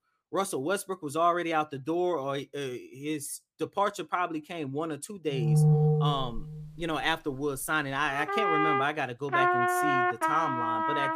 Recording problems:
background music; very loud; from 5.5 s on; 5 dB above the speech

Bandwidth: 15 kHz